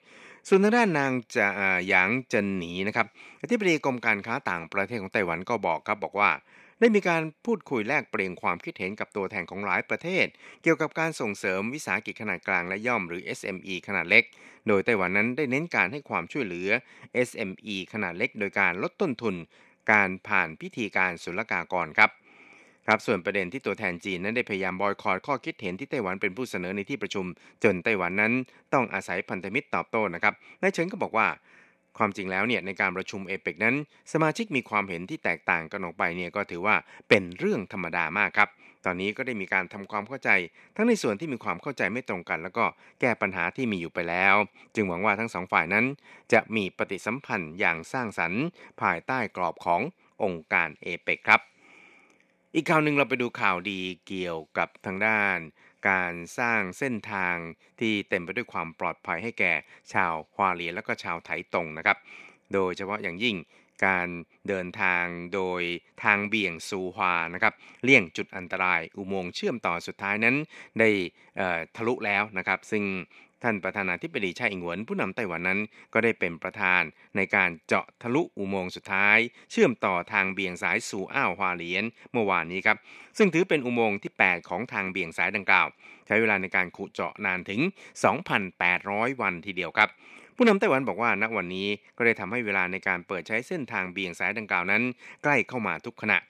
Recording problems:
thin; somewhat; fading below 300 Hz

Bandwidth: 14 kHz